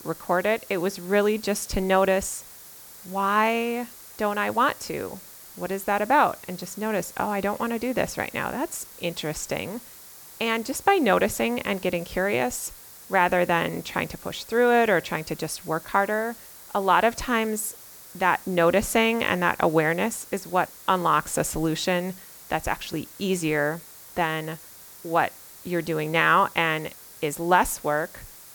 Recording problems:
hiss; noticeable; throughout; 20 dB below the speech

